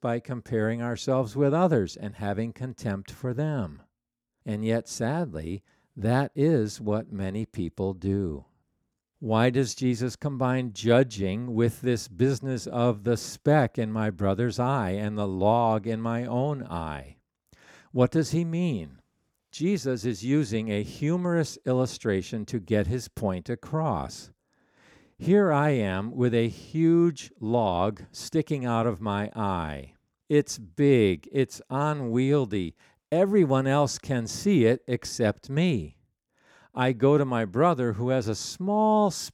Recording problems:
none

